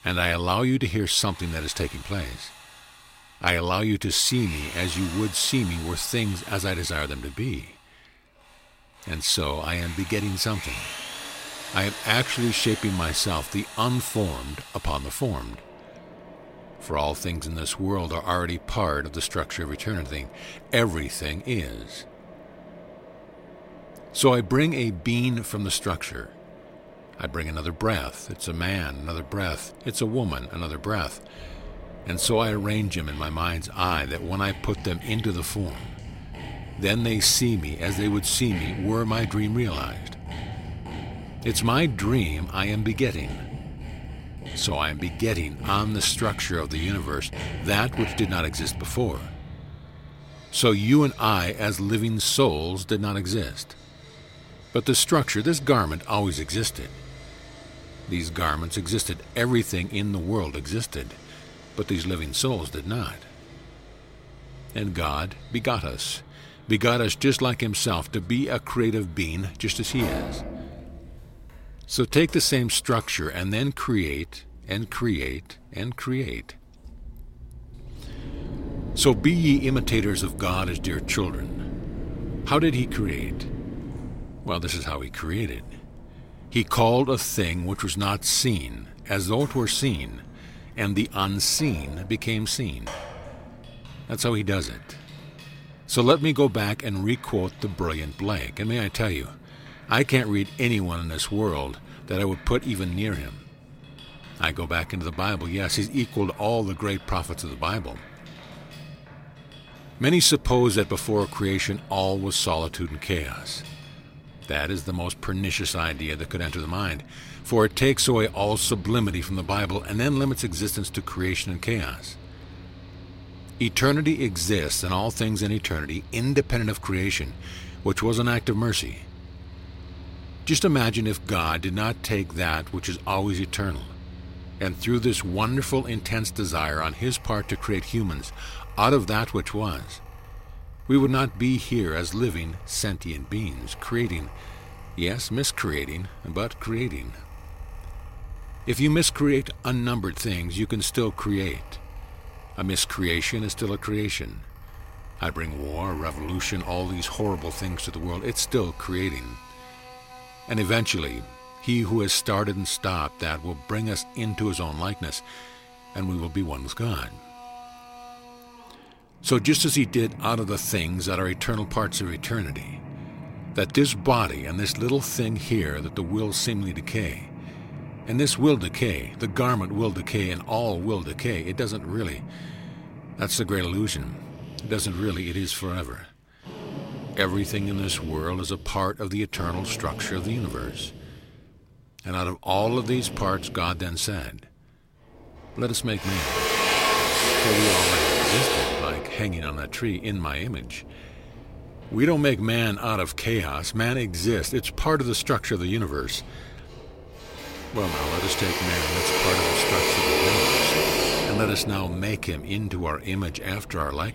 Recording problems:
machinery noise; loud; throughout; 8 dB below the speech

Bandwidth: 16 kHz